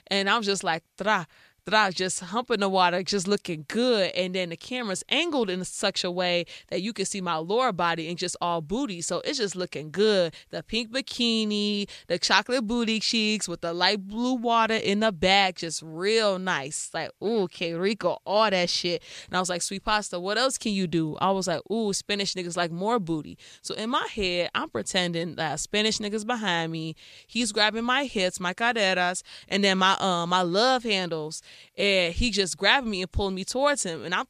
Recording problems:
none

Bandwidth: 14.5 kHz